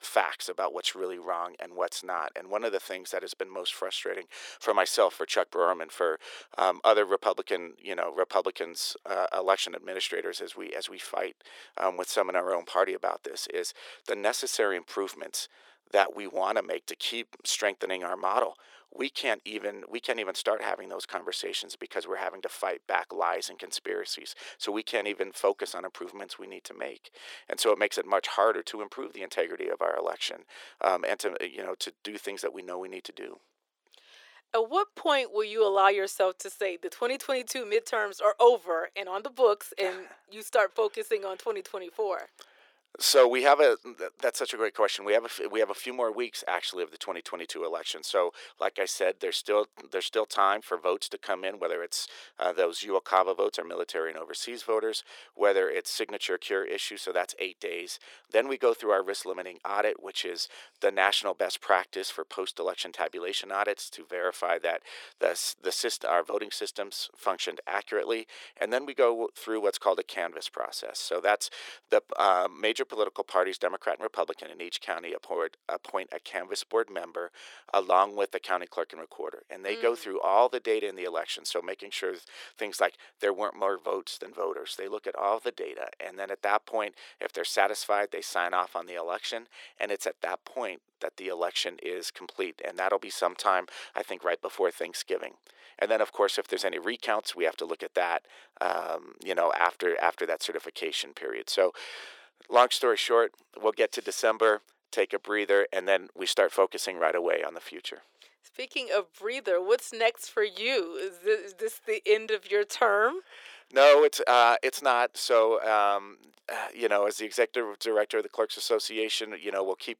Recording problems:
thin; very; fading below 400 Hz

